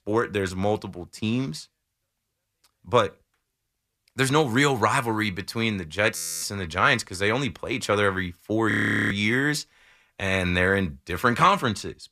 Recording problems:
audio freezing; at 6 s and at 8.5 s

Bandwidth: 14.5 kHz